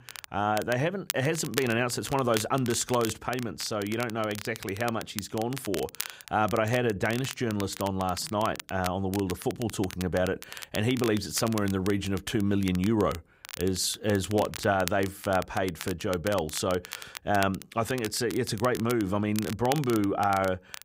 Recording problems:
crackle, like an old record; noticeable; 10 dB below the speech

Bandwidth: 15.5 kHz